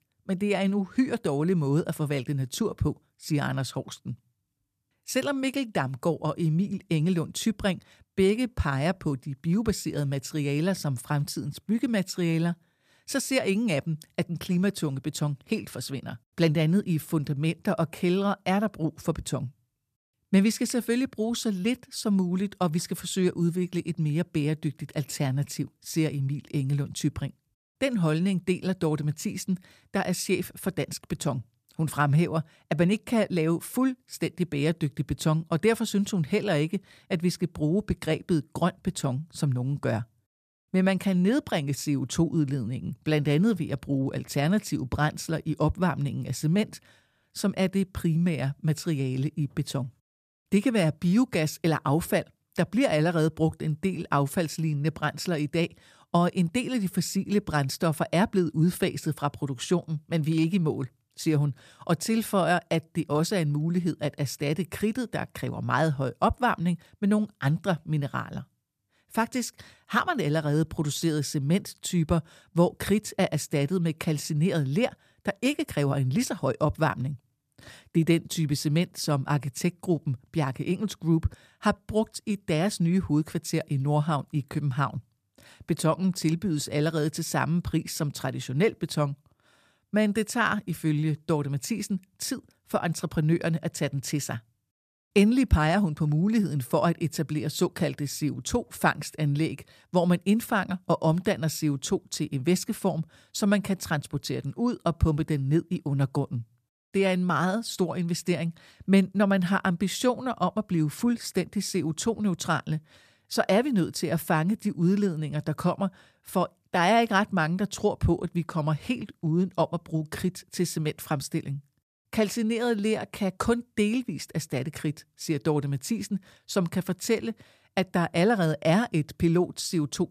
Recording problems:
none

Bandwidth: 14.5 kHz